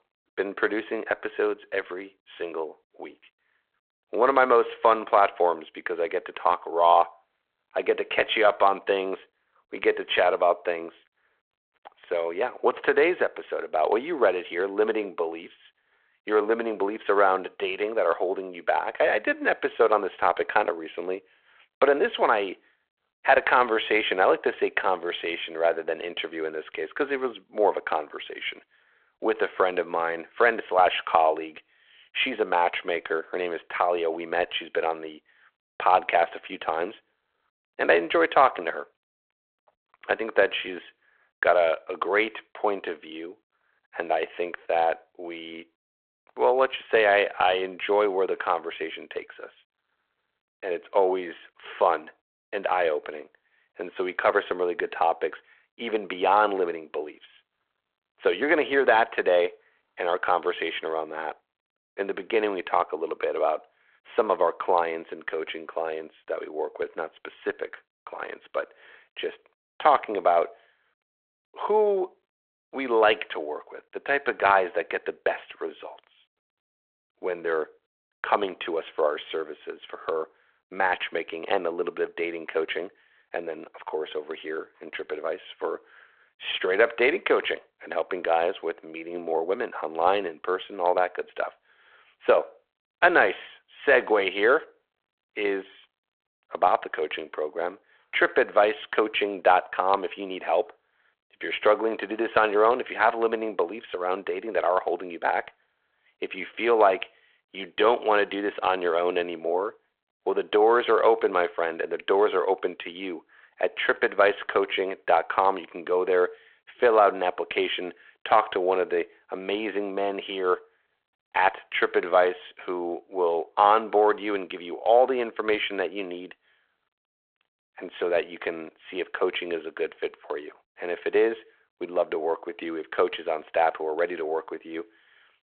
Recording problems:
phone-call audio

